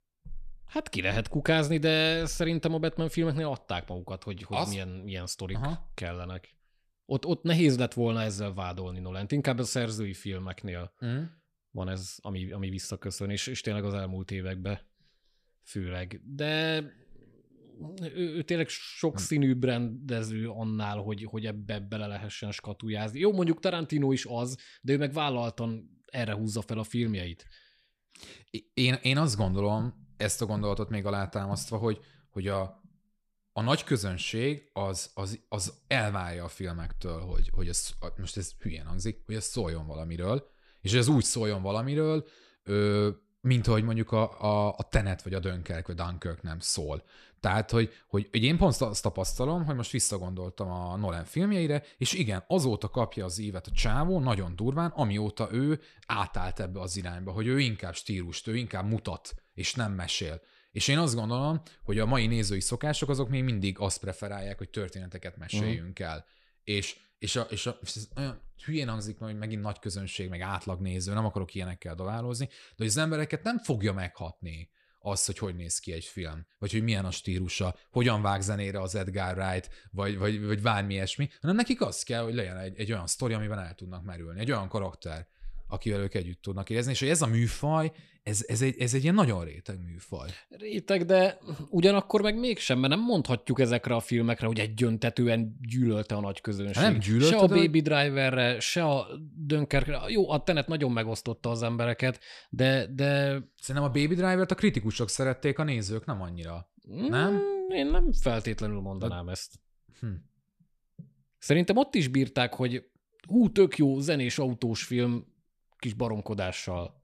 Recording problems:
none

